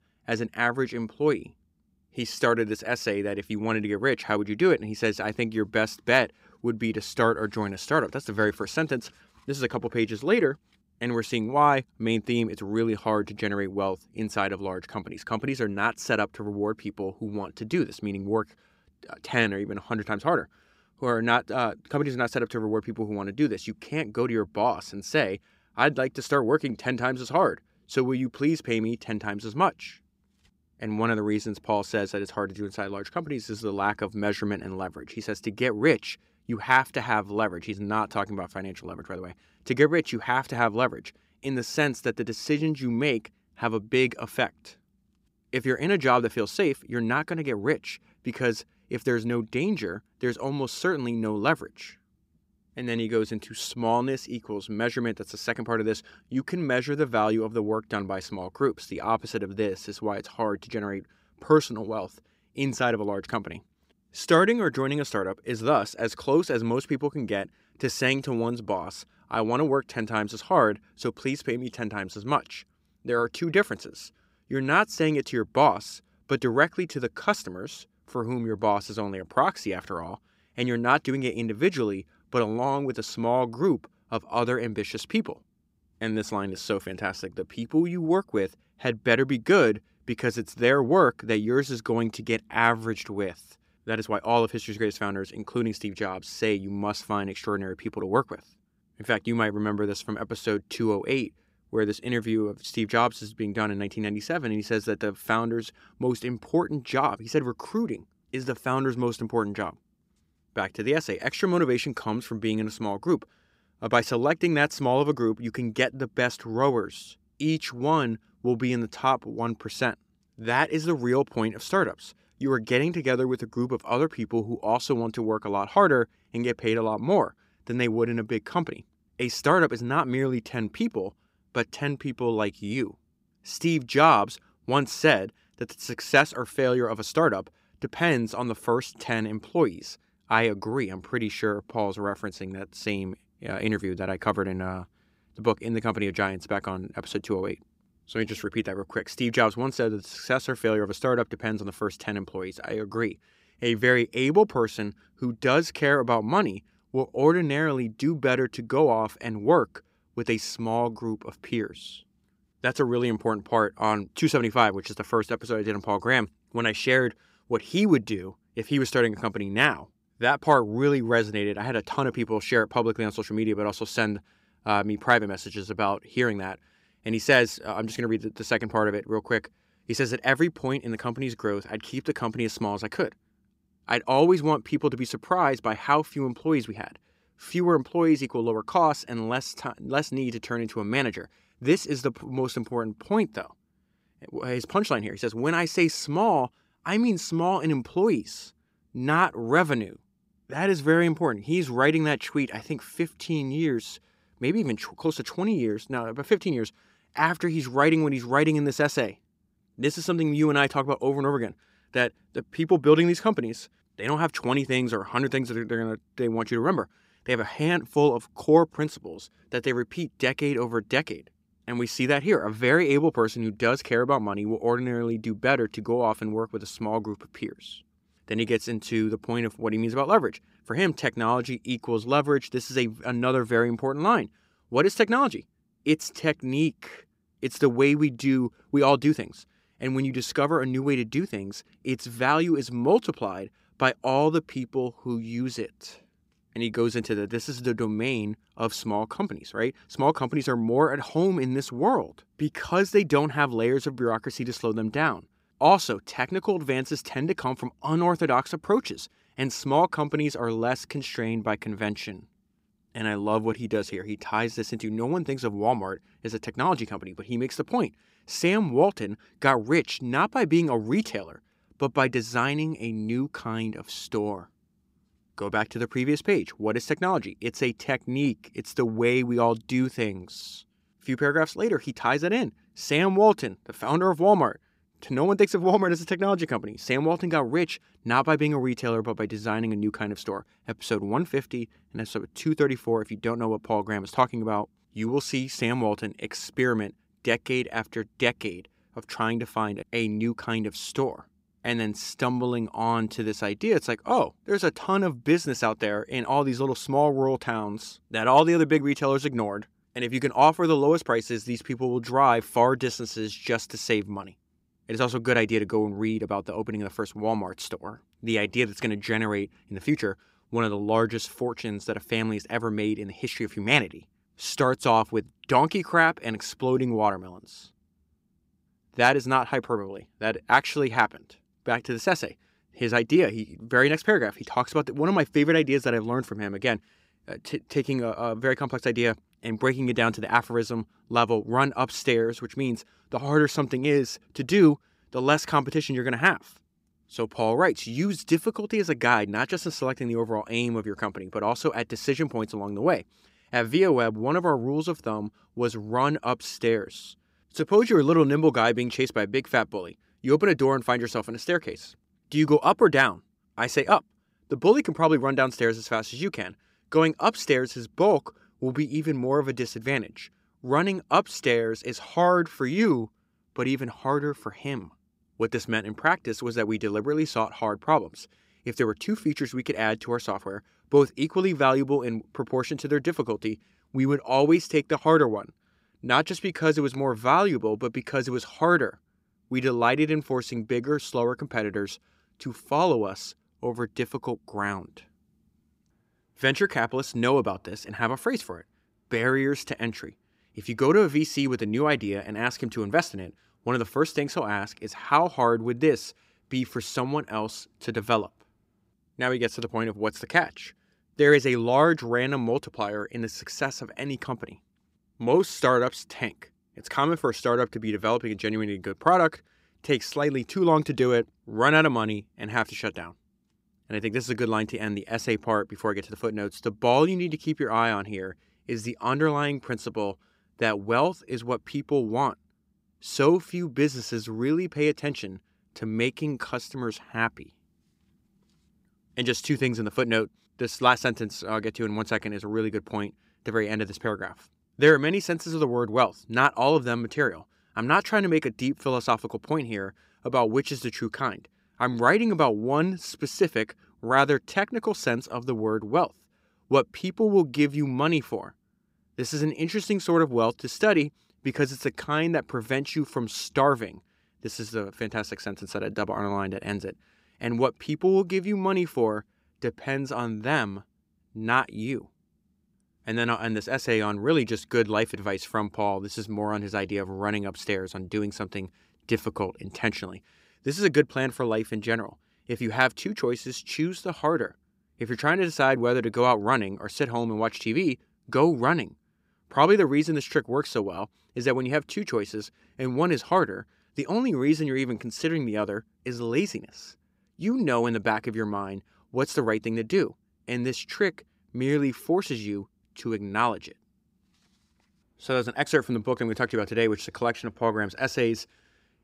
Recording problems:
none

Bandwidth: 15.5 kHz